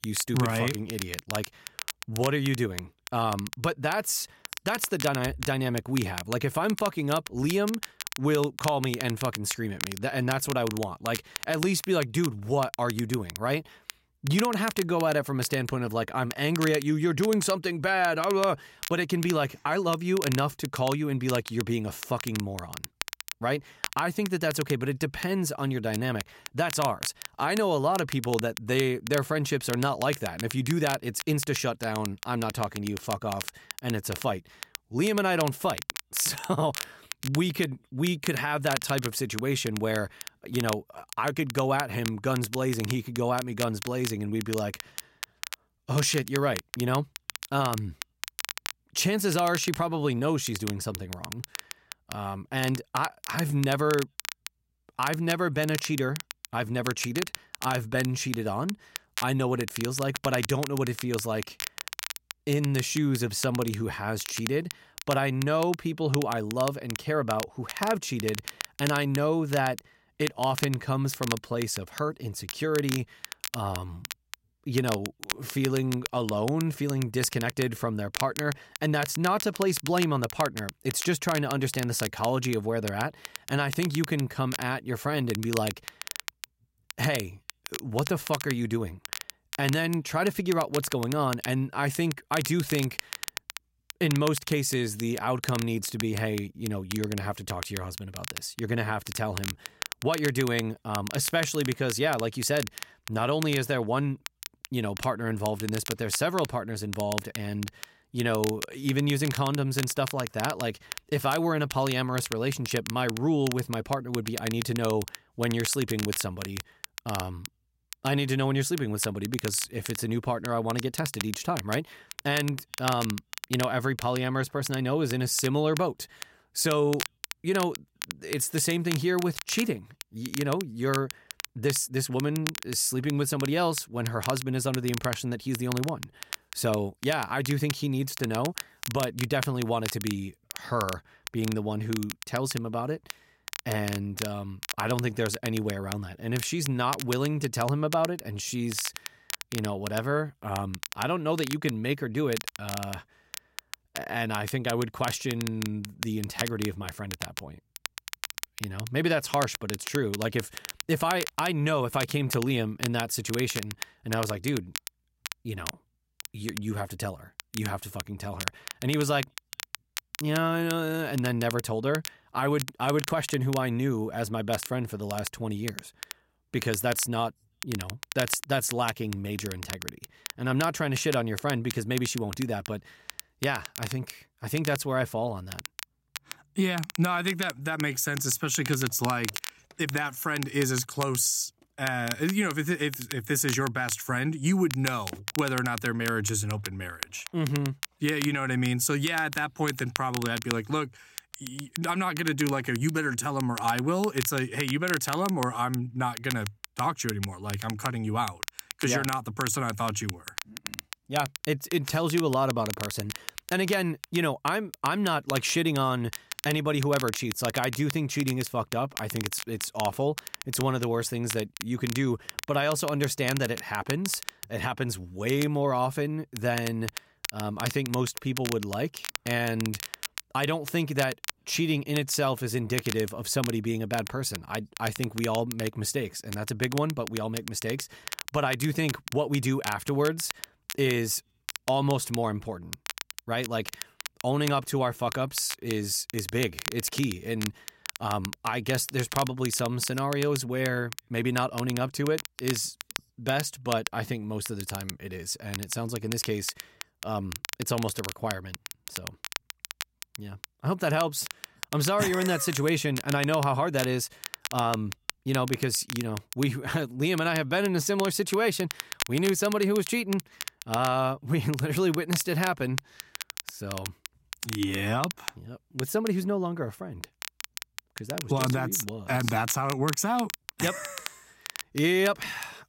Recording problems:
crackle, like an old record; loud; 9 dB below the speech

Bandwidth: 16 kHz